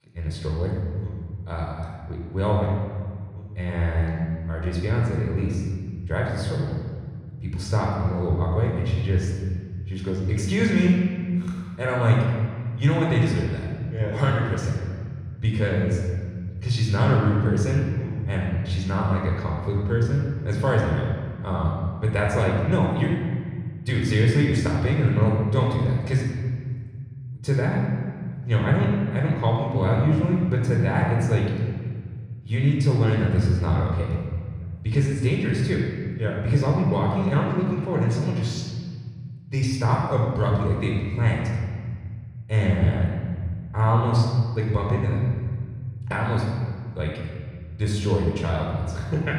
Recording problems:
room echo; noticeable; dies away in 1.9 s
off-mic speech; somewhat distant

